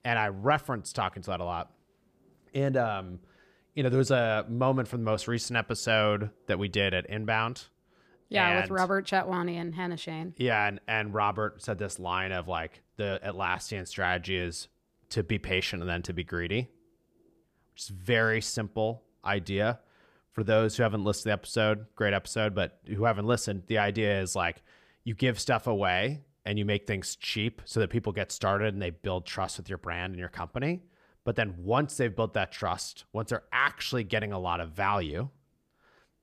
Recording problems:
none

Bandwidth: 15 kHz